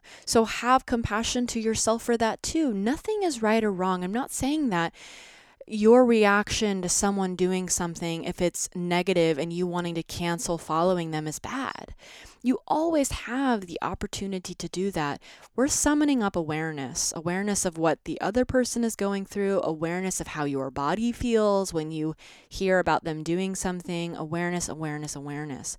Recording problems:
none

